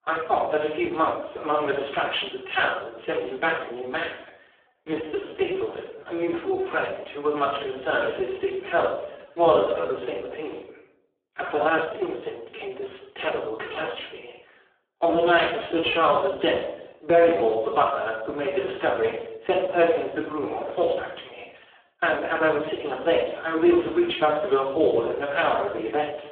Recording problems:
phone-call audio; poor line
off-mic speech; far
room echo; noticeable; dies away in 0.5 s
uneven, jittery; strongly; from 4.5 to 22 s

